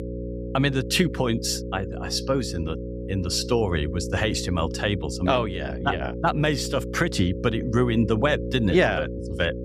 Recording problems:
electrical hum; noticeable; throughout; 60 Hz, 10 dB below the speech

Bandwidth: 15.5 kHz